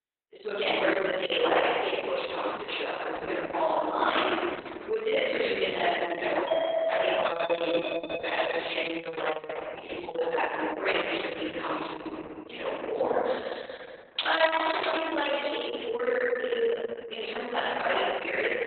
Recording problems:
room echo; strong; dies away in 1.9 s
off-mic speech; far
garbled, watery; badly; nothing above 3.5 kHz
thin; somewhat; fading below 550 Hz
doorbell; loud; from 6.5 to 9 s; peak 2 dB above the speech
jangling keys; noticeable; at 14 s; peak 3 dB below the speech

